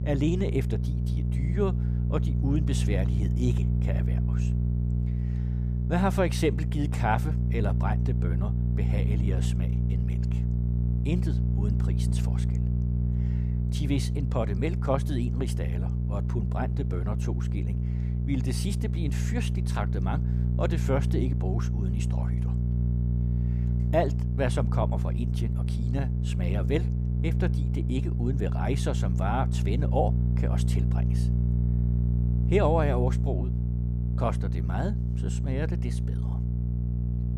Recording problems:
electrical hum; loud; throughout; 60 Hz, 7 dB below the speech

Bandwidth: 15 kHz